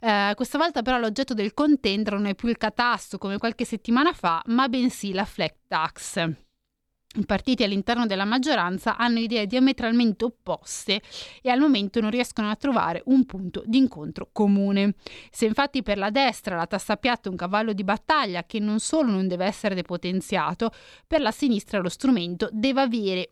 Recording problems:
none

